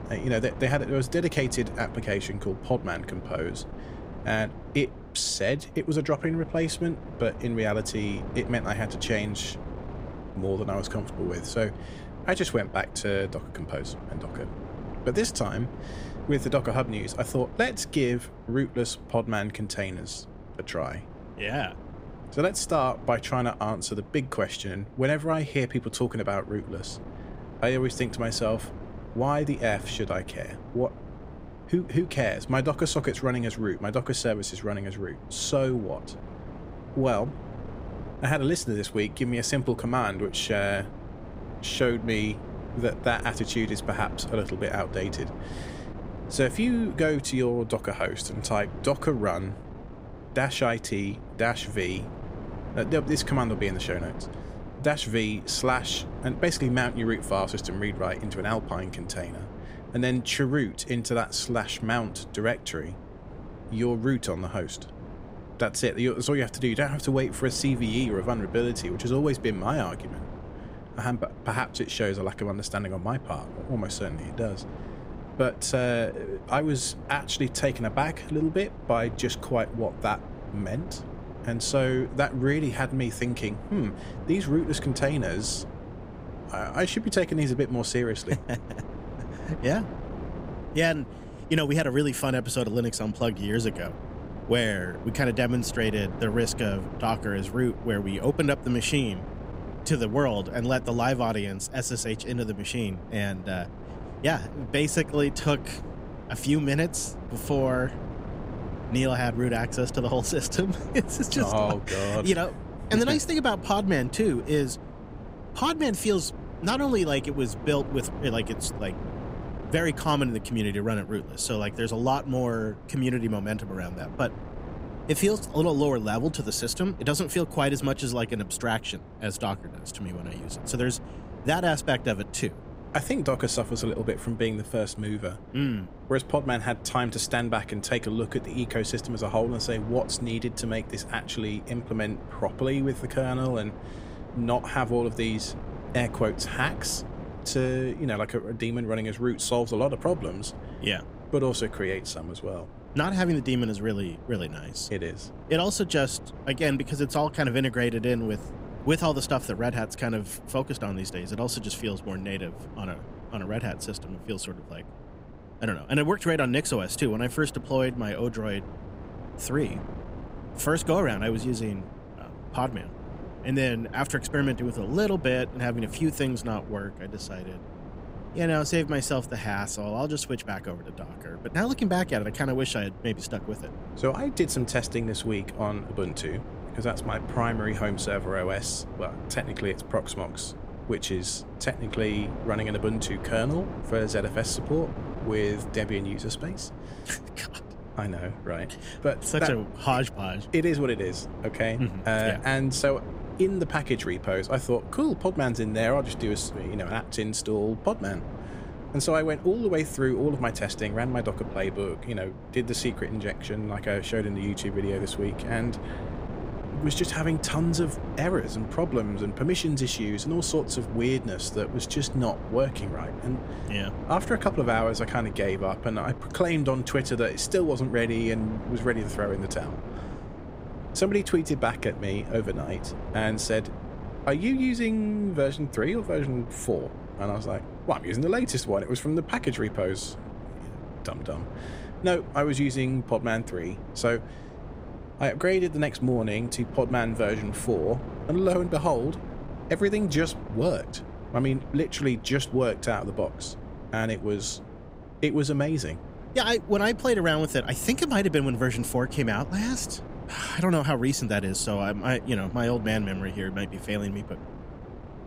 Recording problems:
wind noise on the microphone; occasional gusts; 15 dB below the speech

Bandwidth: 15.5 kHz